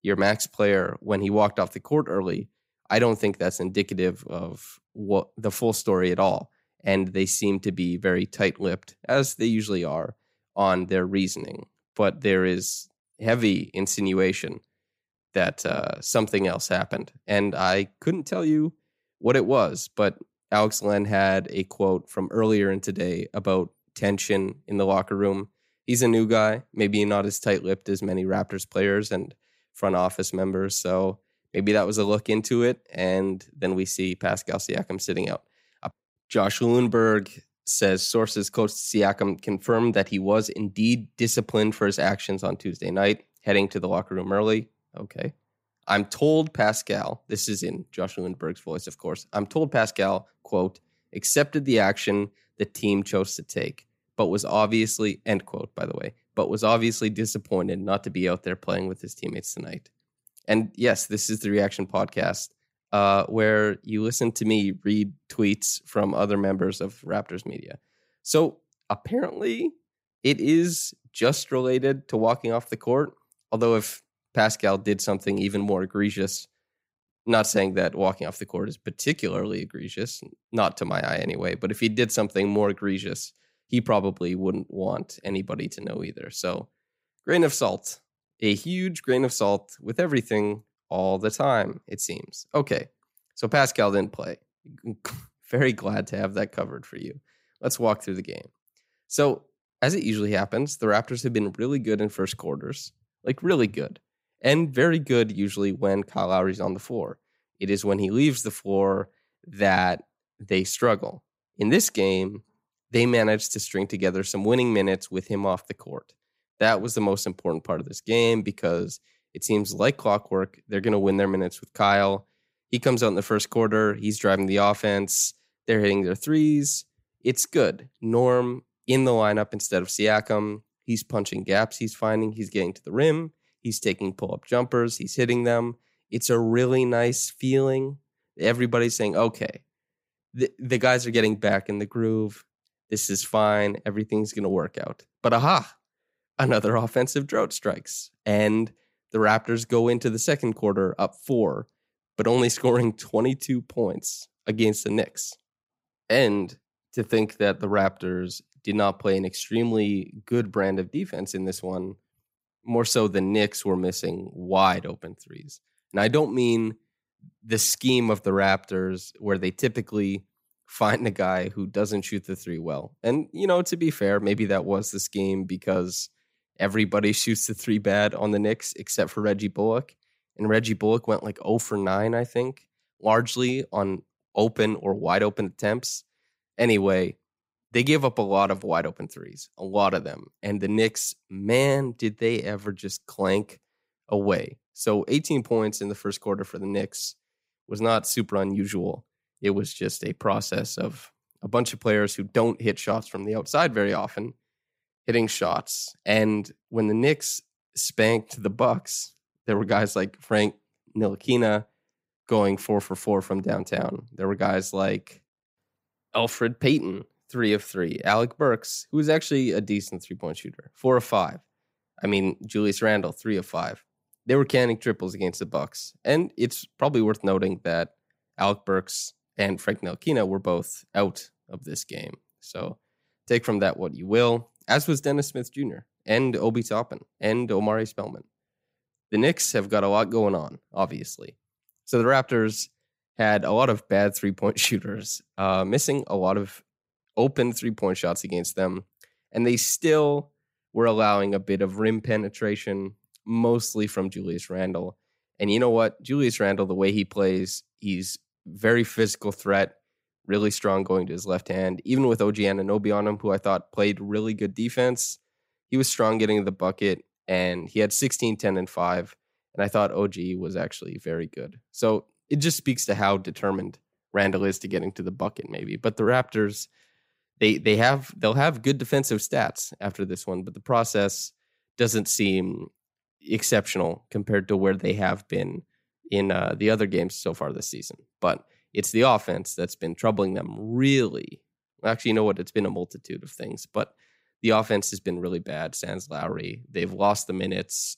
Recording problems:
none

